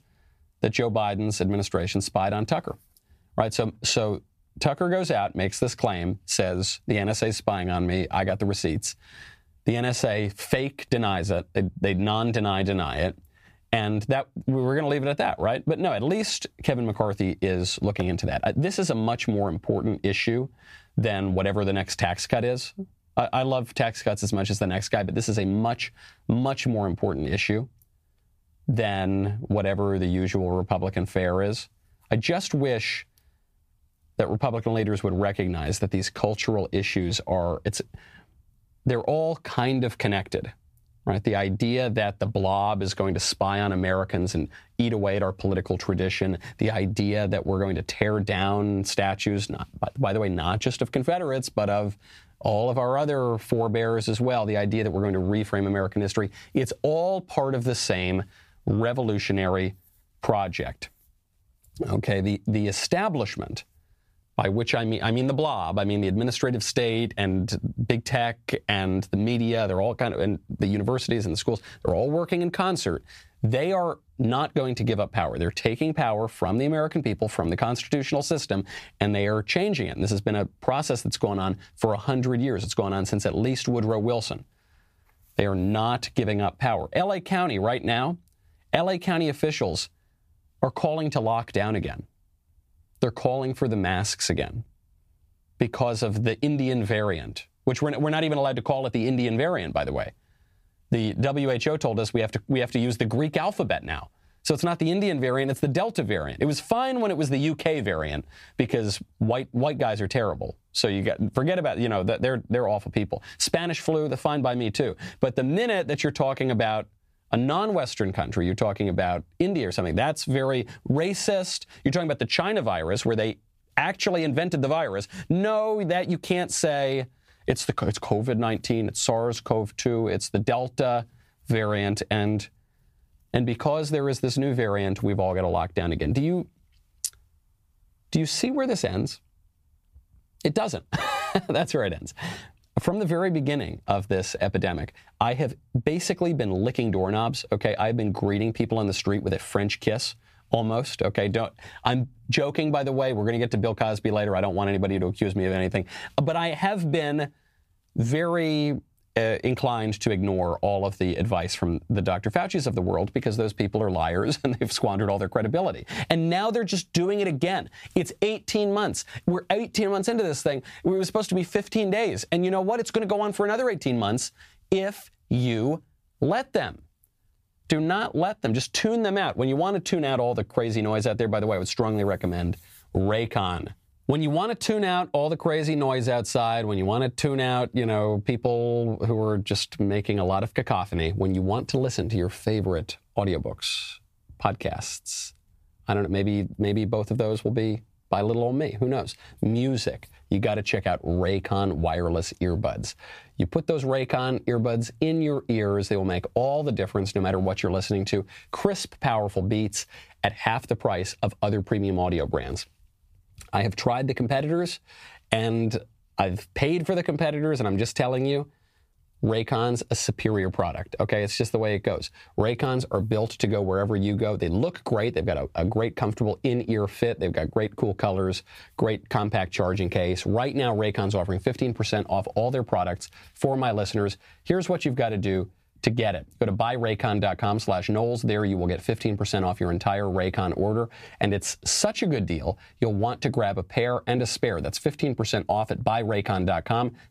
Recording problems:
squashed, flat; somewhat

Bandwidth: 15 kHz